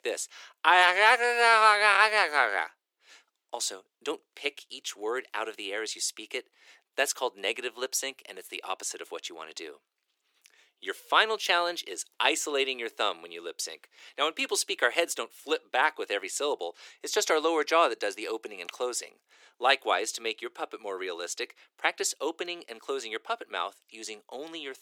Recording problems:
thin; very; fading below 350 Hz

